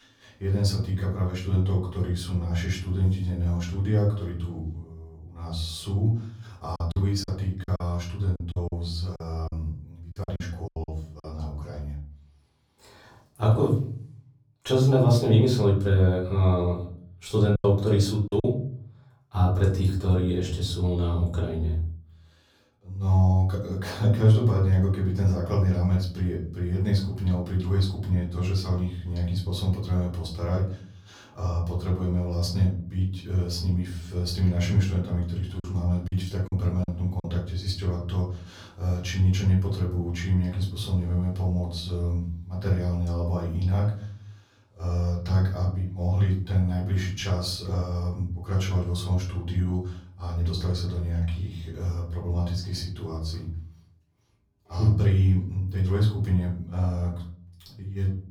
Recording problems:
off-mic speech; far
room echo; slight; dies away in 0.6 s
choppy; very; from 7 to 11 s, at 18 s and from 36 to 37 s; 15% of the speech affected

